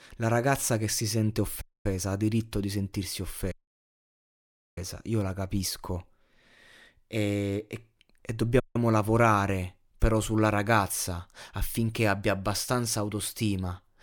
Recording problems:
audio cutting out; at 1.5 s, at 3.5 s for 1 s and at 8.5 s

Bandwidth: 18.5 kHz